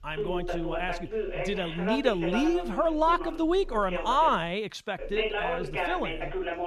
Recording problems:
voice in the background; loud; throughout; 5 dB below the speech

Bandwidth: 13.5 kHz